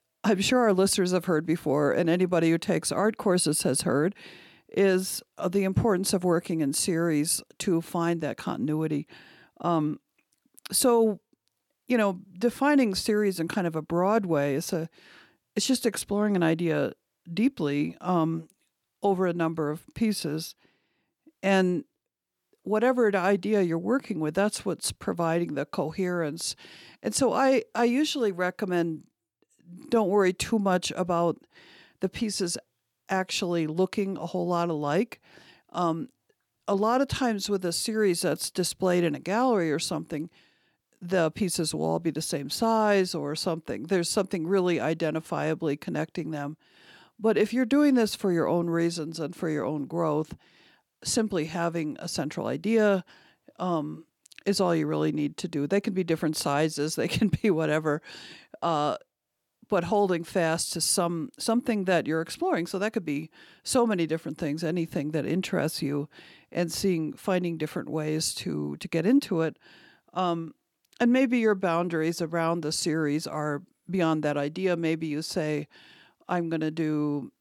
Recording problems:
none

